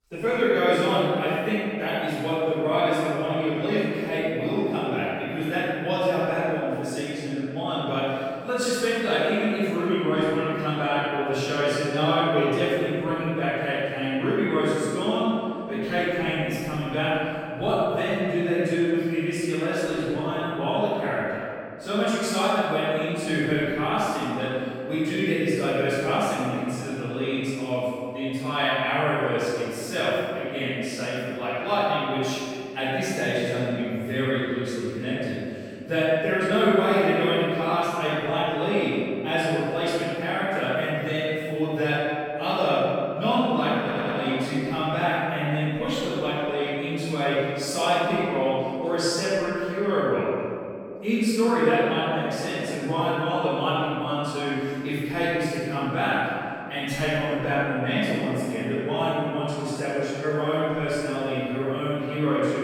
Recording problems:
room echo; strong; dies away in 2.3 s
off-mic speech; far
audio stuttering; at 44 s

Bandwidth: 17.5 kHz